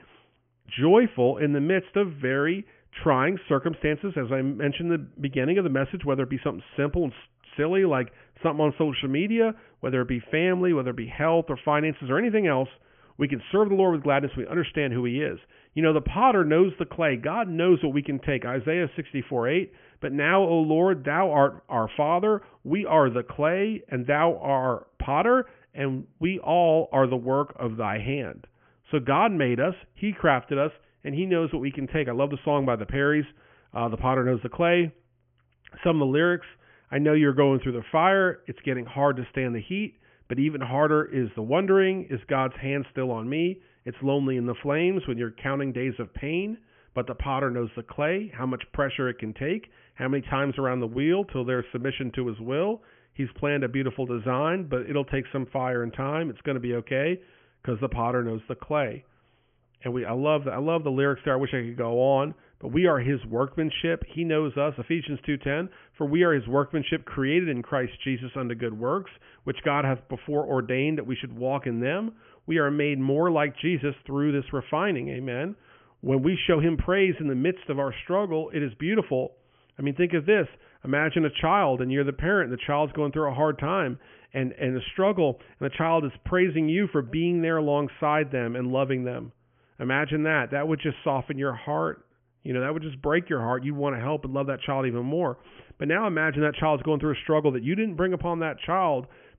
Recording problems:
high frequencies cut off; severe; nothing above 3 kHz

